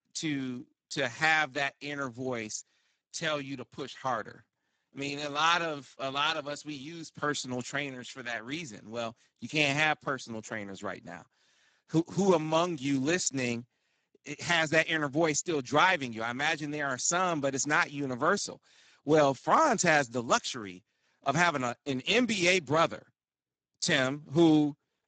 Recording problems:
garbled, watery; badly; nothing above 7.5 kHz

